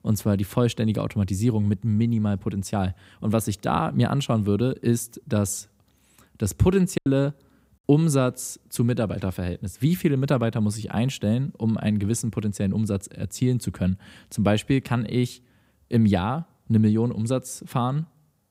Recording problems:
choppy; occasionally; at 7 s; 1% of the speech affected

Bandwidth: 15.5 kHz